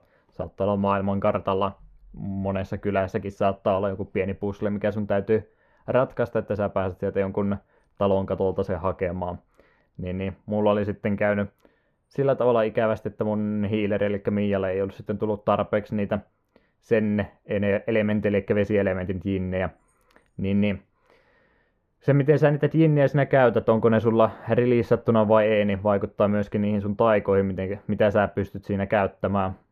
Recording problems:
muffled; very; fading above 2.5 kHz

